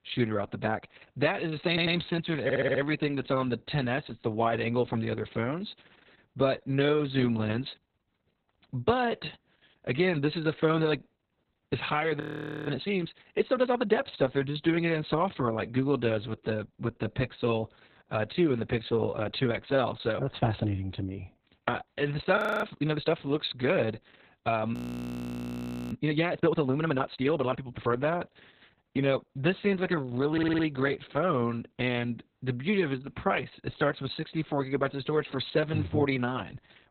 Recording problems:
garbled, watery; badly; nothing above 4 kHz
audio stuttering; at 1.5 s, at 2.5 s and at 30 s
audio freezing; at 12 s, at 22 s and at 25 s for 1 s

